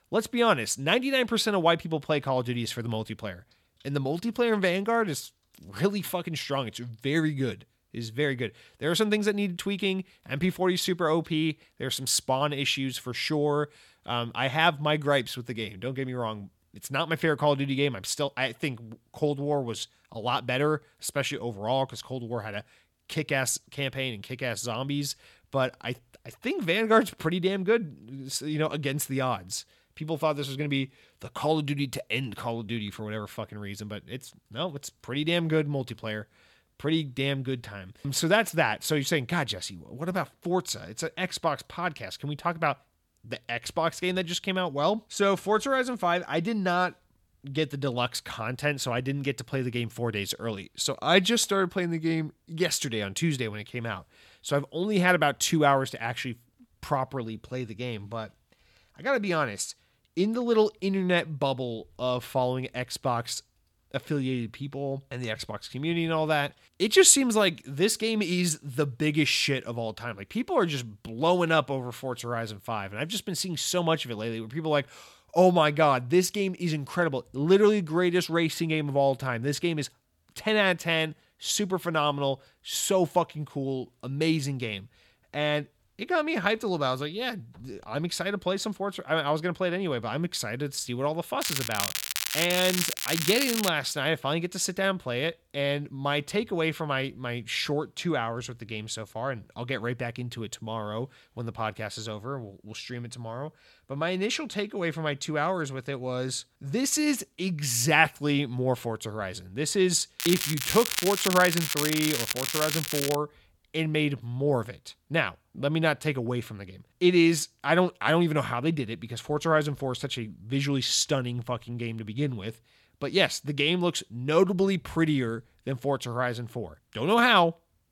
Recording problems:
crackling; loud; from 1:31 to 1:34 and from 1:50 to 1:53; 1 dB below the speech

